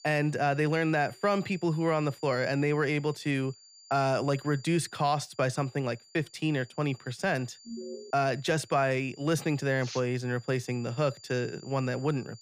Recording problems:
high-pitched whine; faint; throughout; 4.5 kHz, 25 dB below the speech
alarm; faint; at 7.5 s; peak 10 dB below the speech

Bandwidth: 15 kHz